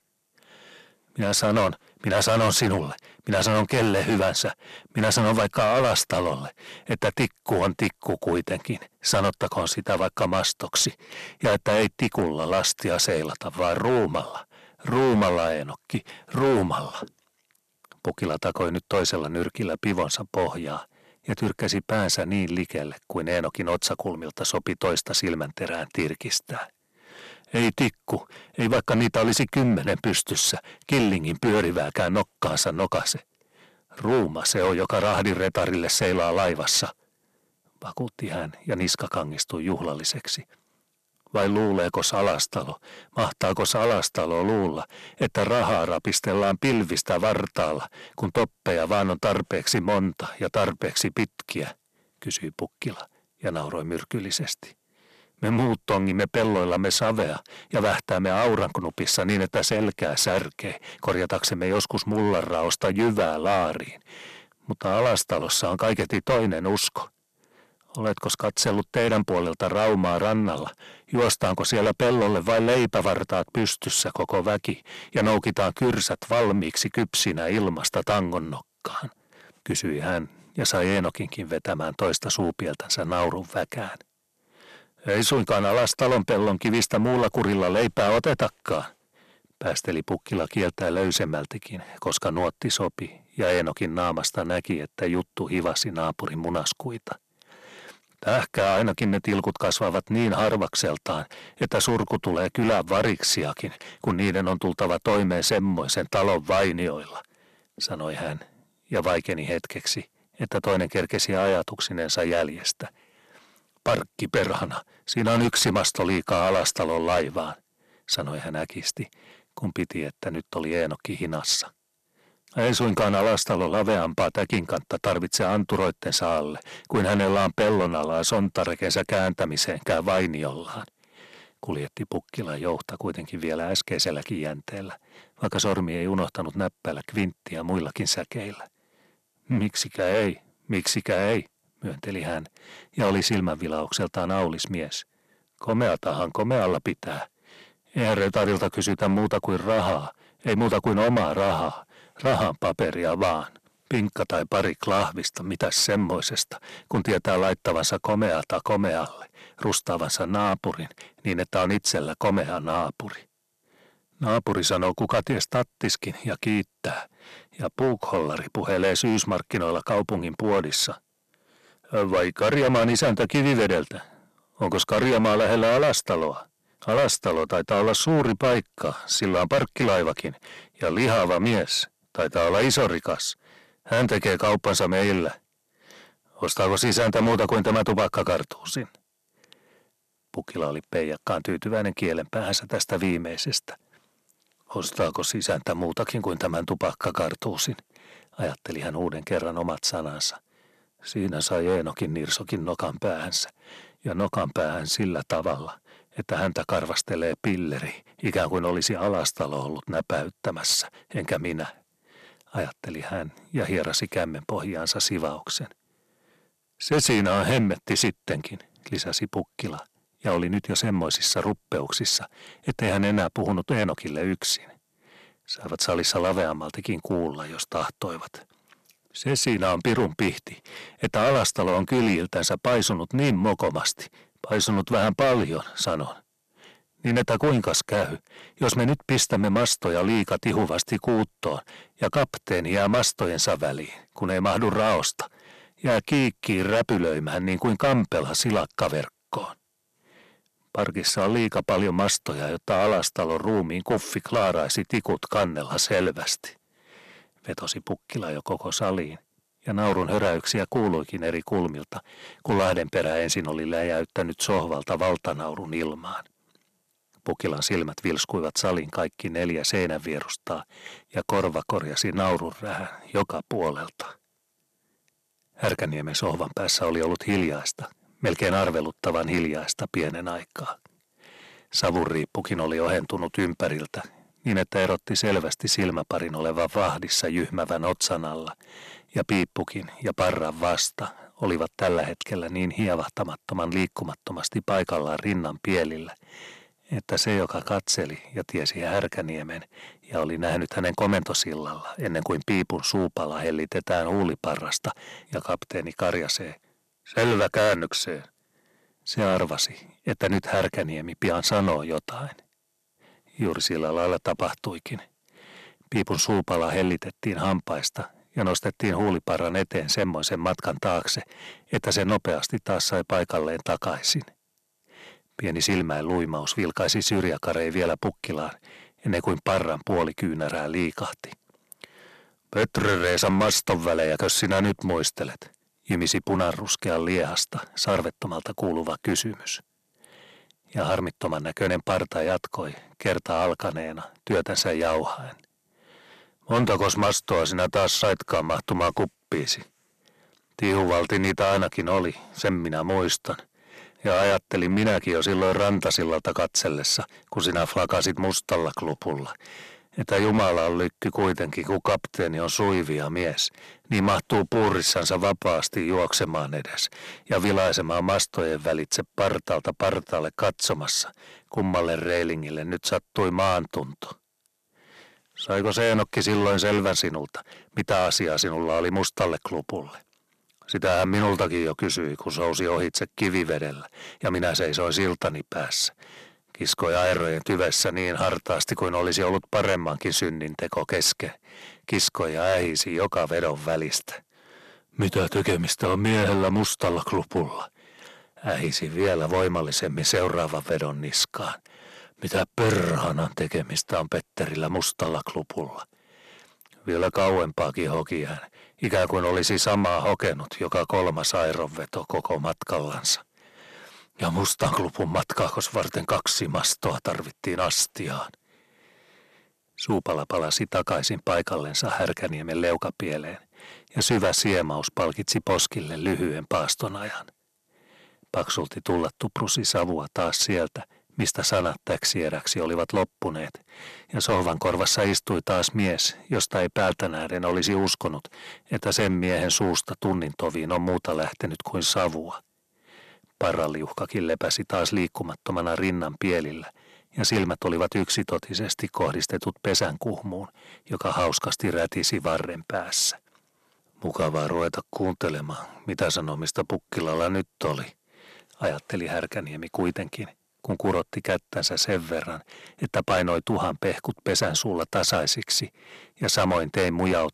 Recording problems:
distortion; heavy; 7% of the sound clipped

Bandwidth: 13.5 kHz